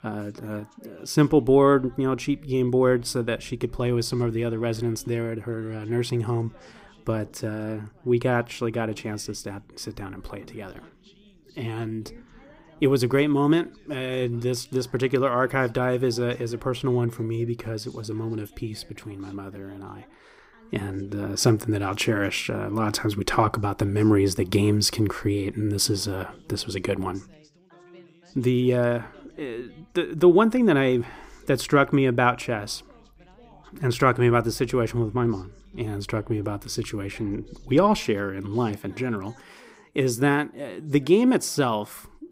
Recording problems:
background chatter; faint; throughout; 3 voices, 30 dB below the speech

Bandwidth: 15.5 kHz